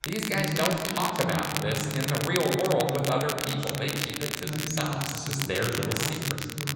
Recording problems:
room echo; noticeable; dies away in 2 s
off-mic speech; somewhat distant
voice in the background; loud; throughout; 6 dB below the speech
crackle, like an old record; loud; 3 dB below the speech

